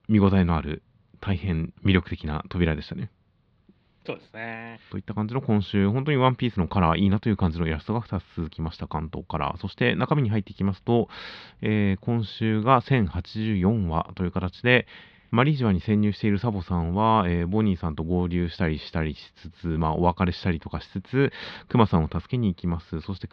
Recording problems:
muffled; very slightly; fading above 4 kHz

